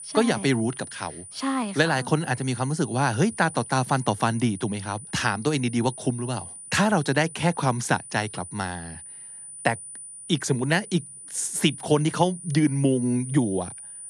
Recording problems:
high-pitched whine; noticeable; throughout; 9.5 kHz, 15 dB below the speech

